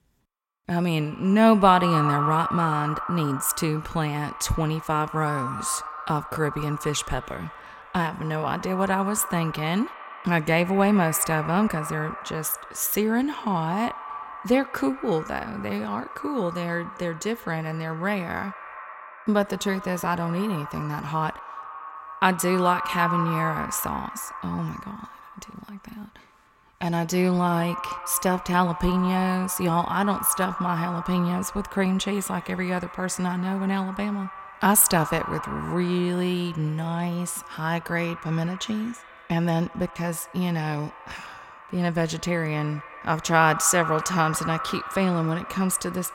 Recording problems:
echo of what is said; strong; throughout; 80 ms later, 10 dB below the speech

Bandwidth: 16.5 kHz